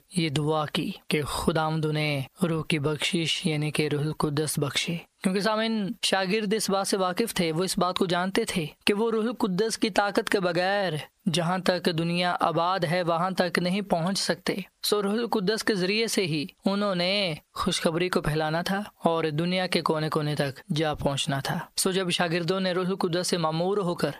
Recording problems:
squashed, flat; heavily

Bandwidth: 14.5 kHz